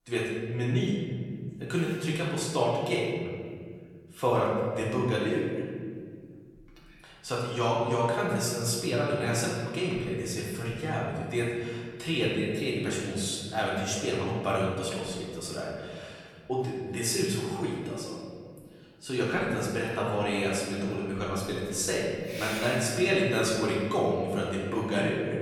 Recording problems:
off-mic speech; far
room echo; noticeable; dies away in 1.9 s

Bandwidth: 19 kHz